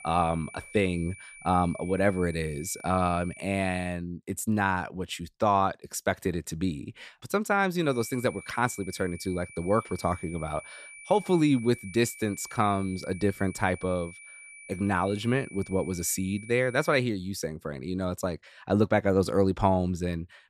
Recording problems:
high-pitched whine; noticeable; until 4 s and from 8 to 17 s; 2.5 kHz, 15 dB below the speech

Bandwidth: 14.5 kHz